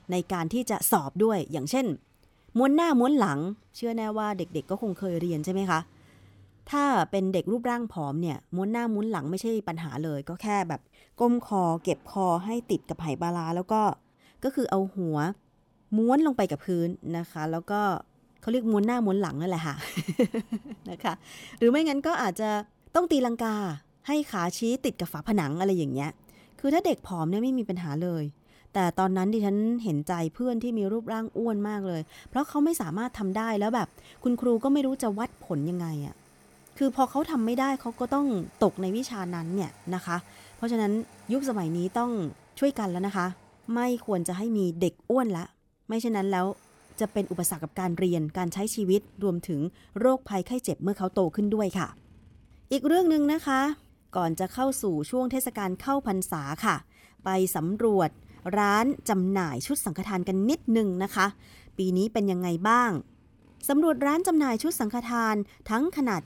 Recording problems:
traffic noise; faint; throughout; 30 dB below the speech

